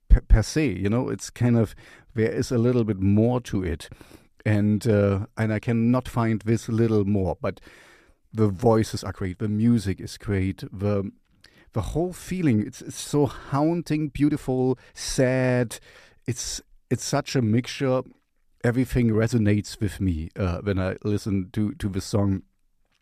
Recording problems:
uneven, jittery; strongly; from 2 to 22 s

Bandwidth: 14.5 kHz